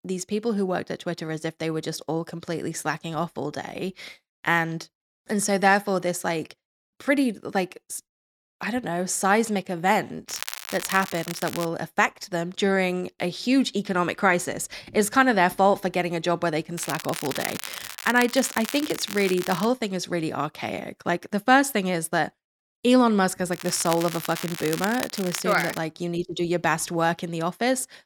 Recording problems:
crackling; loud; from 10 to 12 s, from 17 to 20 s and from 24 to 26 s; 9 dB below the speech

